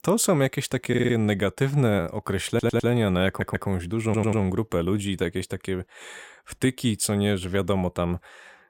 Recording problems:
audio stuttering; 4 times, first at 1 s

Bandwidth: 16.5 kHz